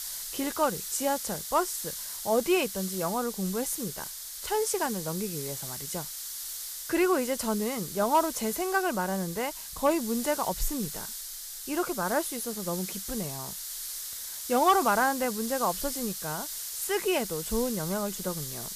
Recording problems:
hiss; loud; throughout; 5 dB below the speech

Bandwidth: 14.5 kHz